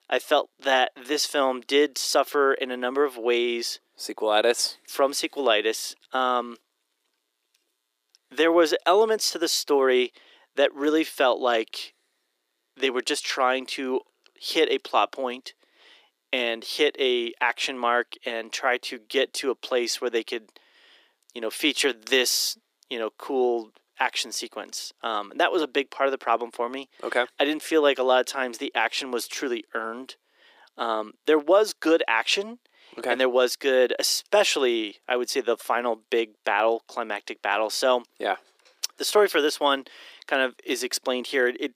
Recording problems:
thin; somewhat; fading below 350 Hz

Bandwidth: 15 kHz